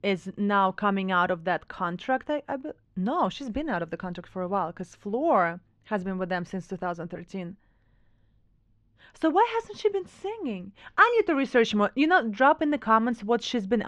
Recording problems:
muffled; slightly; fading above 4 kHz
abrupt cut into speech; at the end

